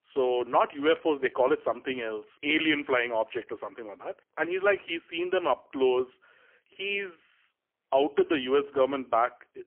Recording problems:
phone-call audio; poor line; nothing above 3 kHz

